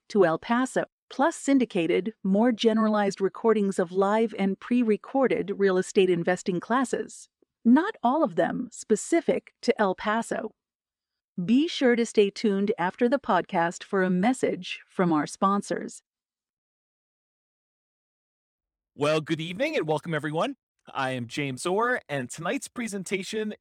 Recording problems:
none

